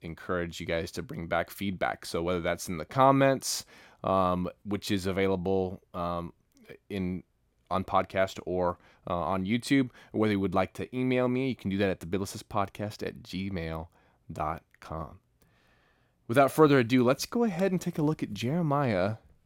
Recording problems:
none

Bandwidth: 16.5 kHz